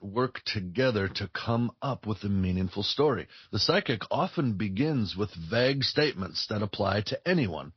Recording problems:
high frequencies cut off; noticeable; nothing above 5.5 kHz
garbled, watery; slightly

